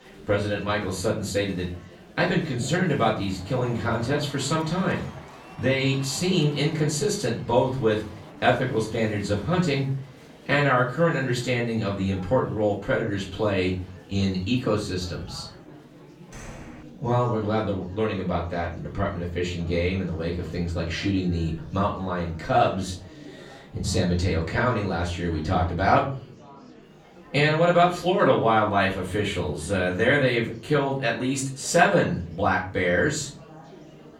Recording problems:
off-mic speech; far
room echo; slight; dies away in 0.4 s
murmuring crowd; faint; throughout; 20 dB below the speech
door banging; faint; at 16 s; peak 15 dB below the speech

